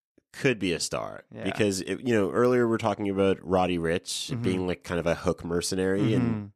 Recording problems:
none

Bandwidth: 13.5 kHz